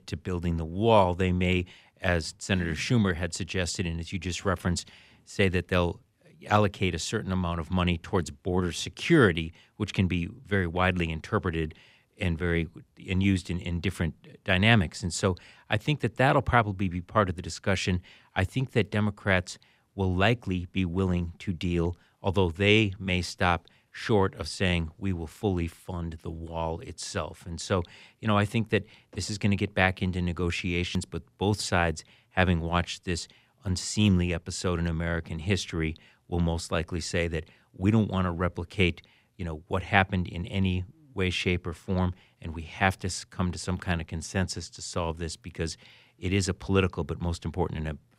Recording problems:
none

